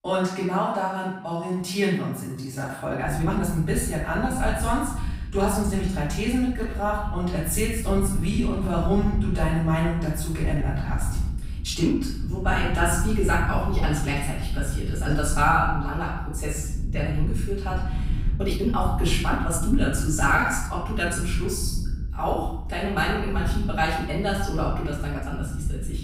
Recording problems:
off-mic speech; far
room echo; noticeable; dies away in 0.7 s
low rumble; noticeable; from 3 s on; 20 dB below the speech
uneven, jittery; strongly; from 1 to 26 s

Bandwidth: 15.5 kHz